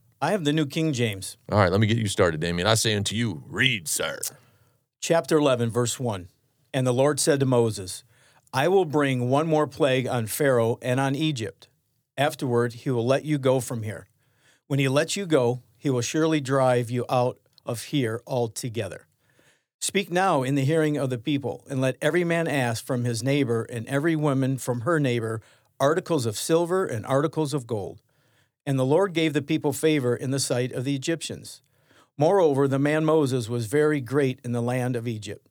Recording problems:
none

